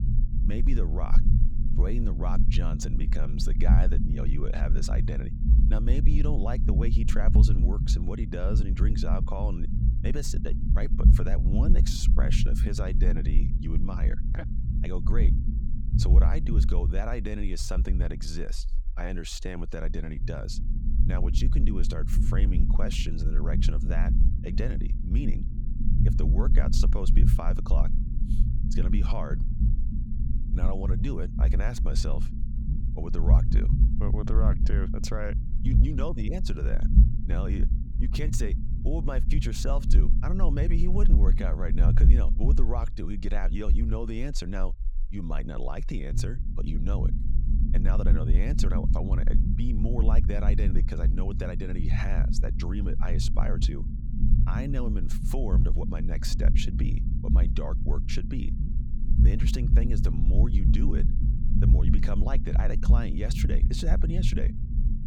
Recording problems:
low rumble; loud; throughout; 4 dB below the speech

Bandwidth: 18.5 kHz